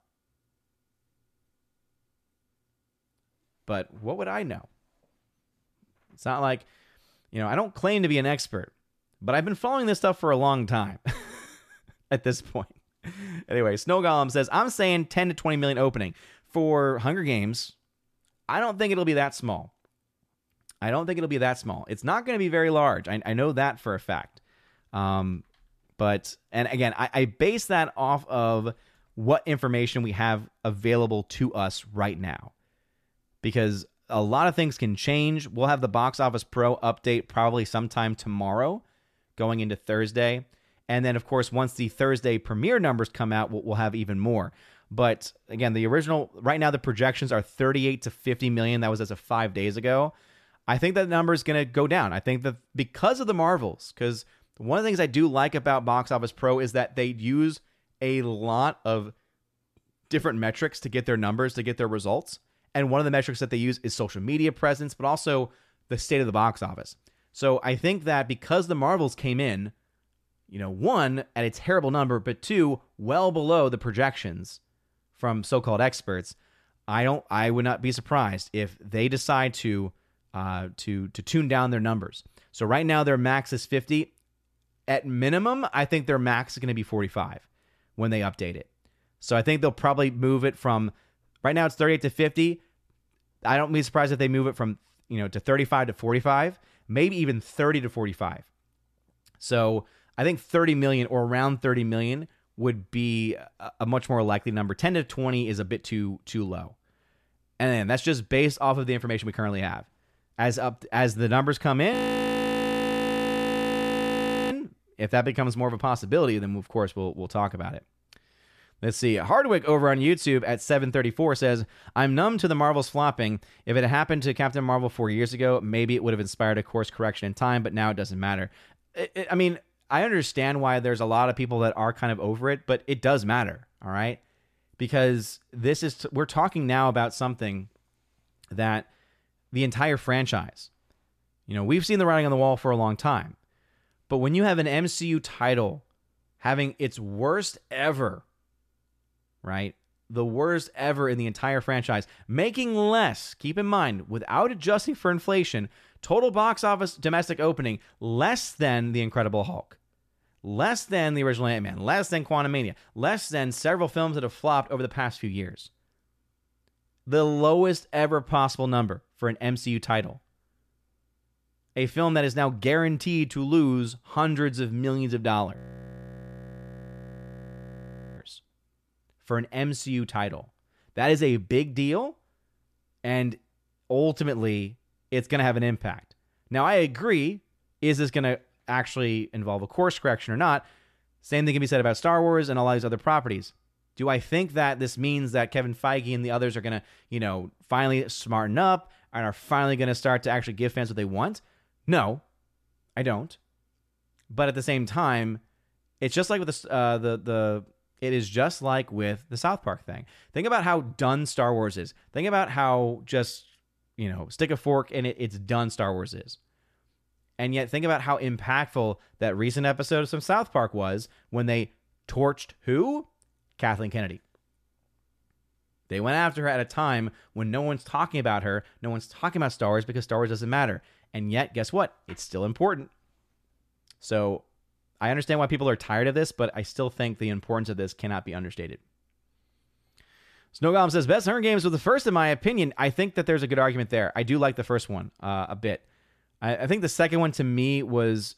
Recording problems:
audio freezing; at 1:52 for 2.5 s and at 2:56 for 2.5 s

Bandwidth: 14.5 kHz